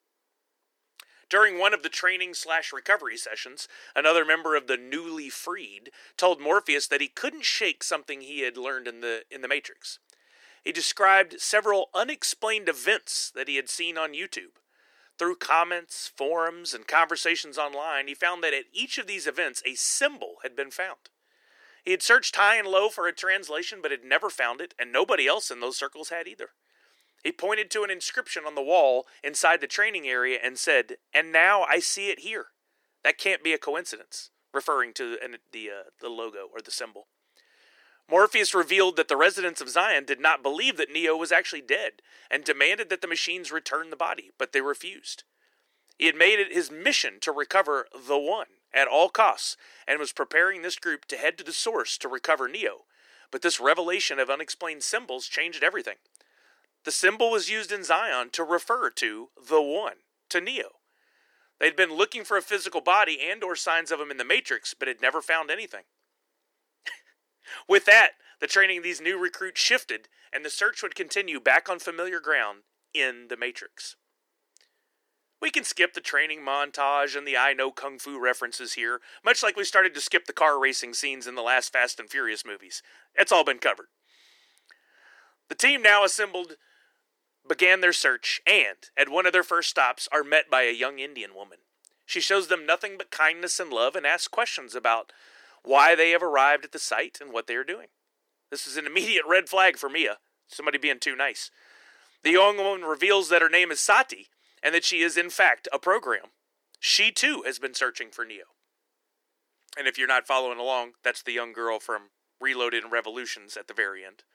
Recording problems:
thin; very; fading below 350 Hz

